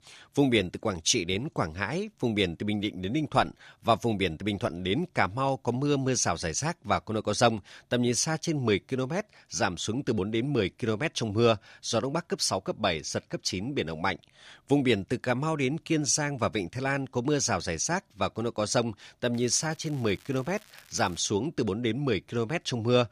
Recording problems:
crackling; faint; from 19 to 21 s; 25 dB below the speech

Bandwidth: 15 kHz